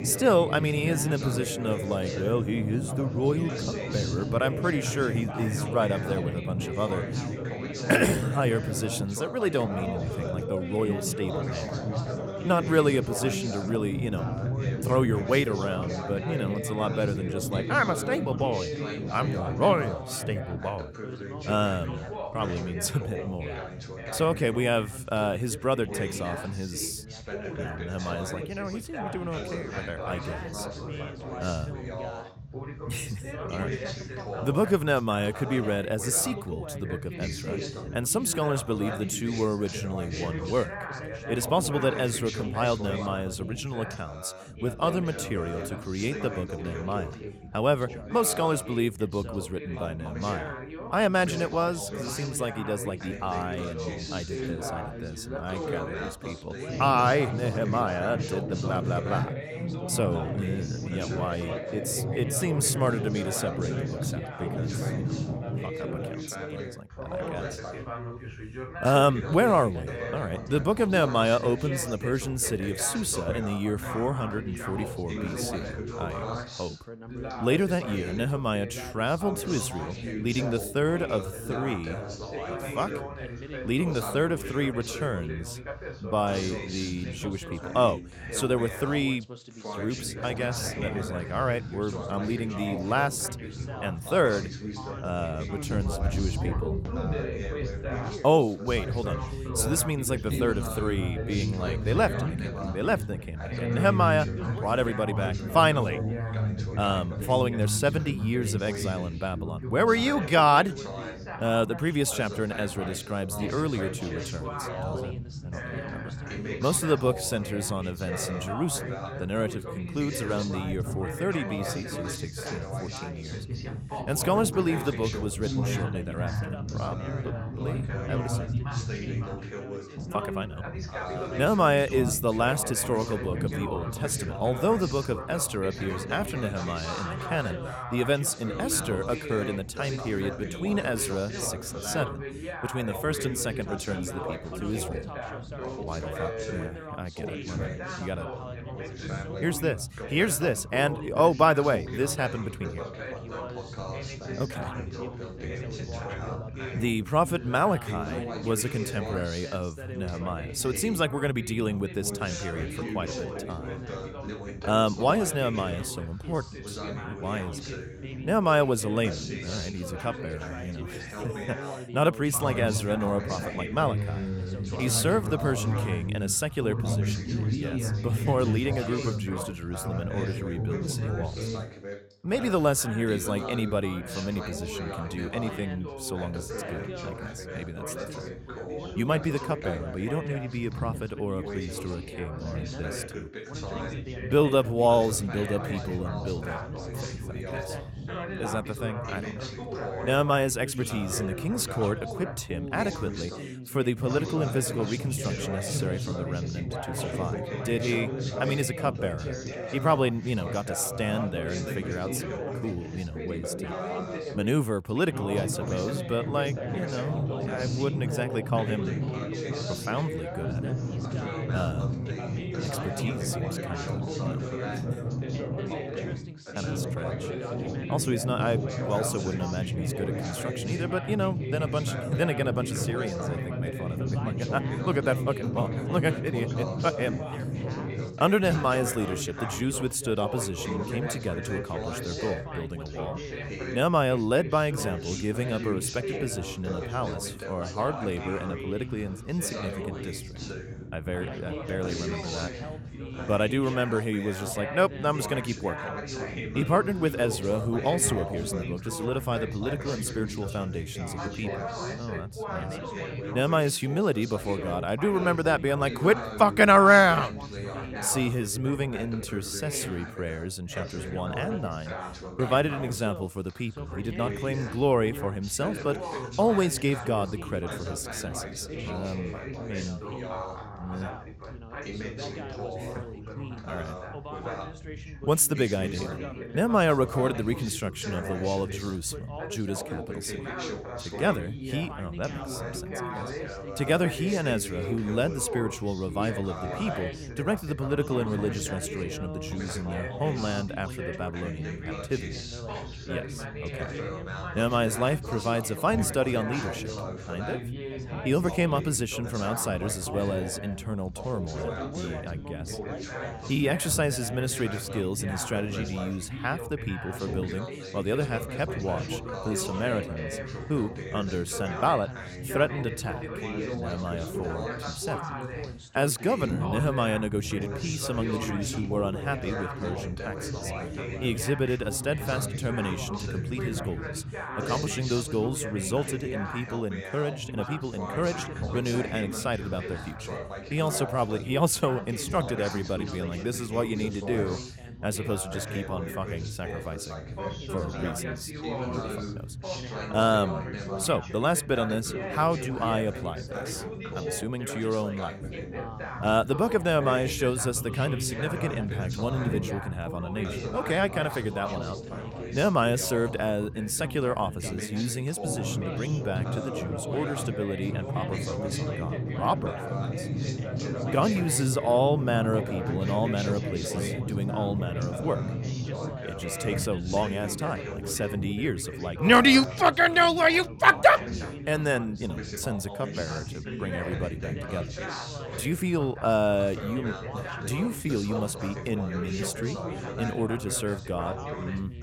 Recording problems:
background chatter; loud; throughout; 3 voices, 6 dB below the speech

